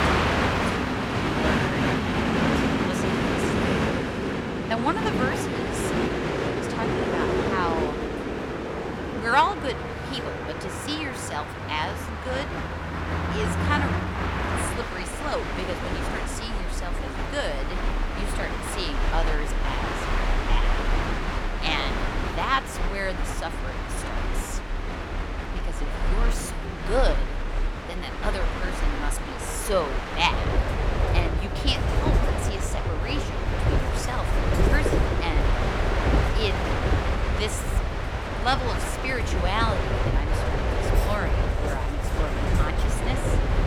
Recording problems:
train or aircraft noise; very loud; throughout; 4 dB above the speech
household noises; faint; throughout; 25 dB below the speech

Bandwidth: 17.5 kHz